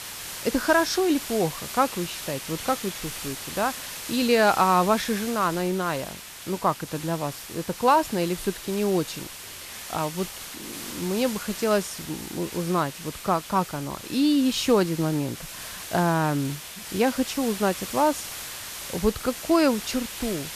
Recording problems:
hiss; loud; throughout; 10 dB below the speech

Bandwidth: 14.5 kHz